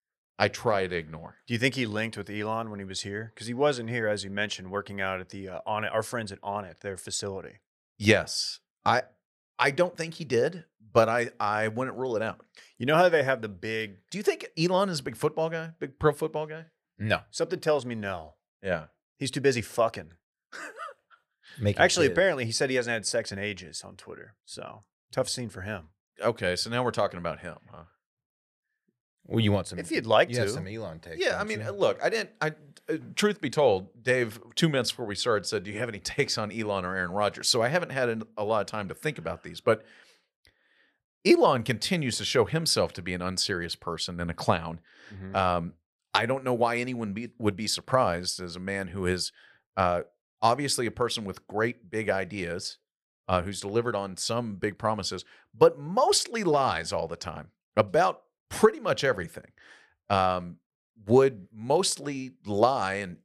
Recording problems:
none

